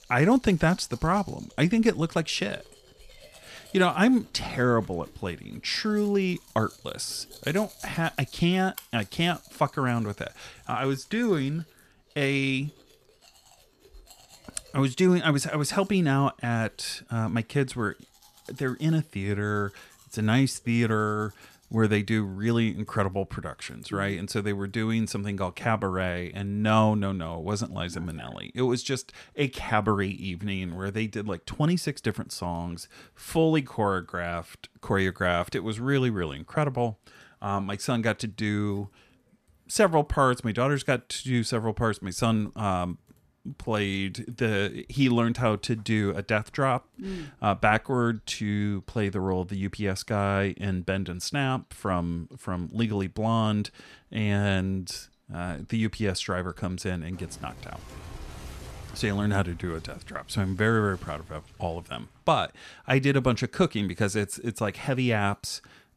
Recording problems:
household noises; faint; throughout; 25 dB below the speech

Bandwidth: 14.5 kHz